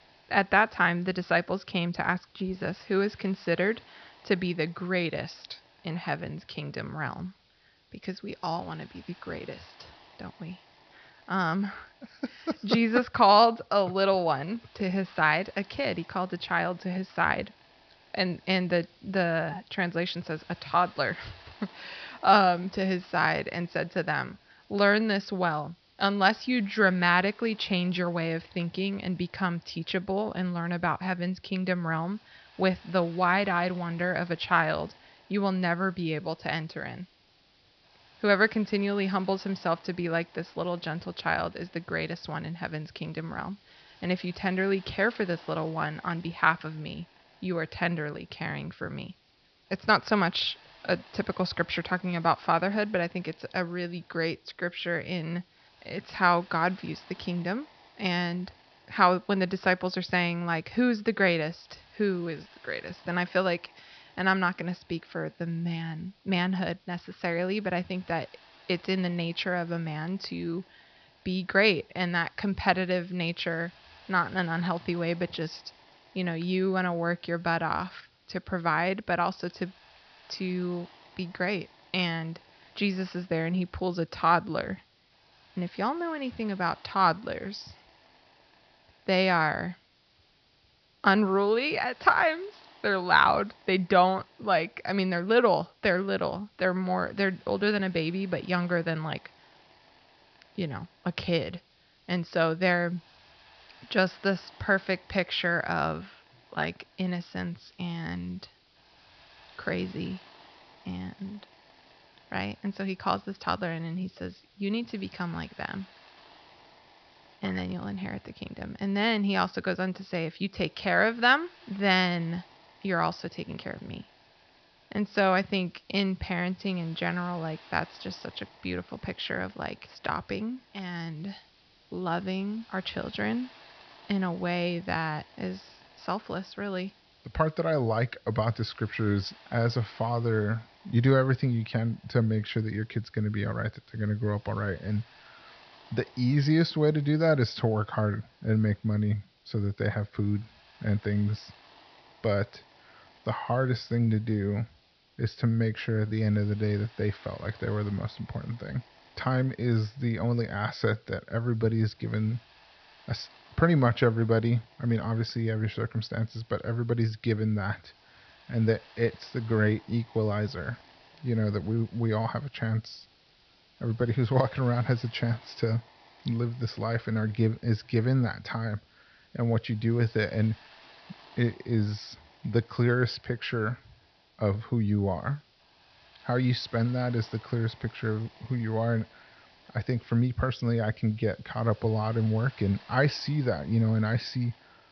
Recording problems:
high frequencies cut off; noticeable; nothing above 5.5 kHz
hiss; faint; throughout; 25 dB below the speech

